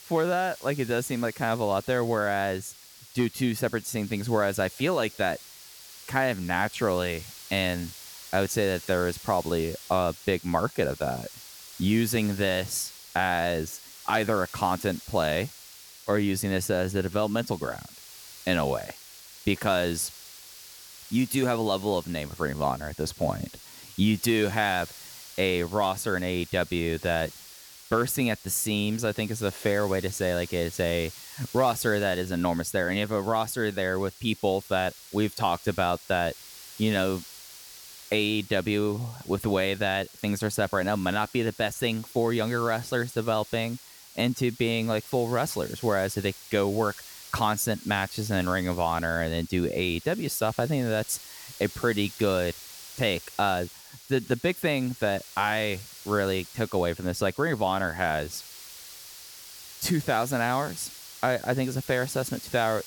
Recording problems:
hiss; noticeable; throughout; 15 dB below the speech

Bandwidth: 18 kHz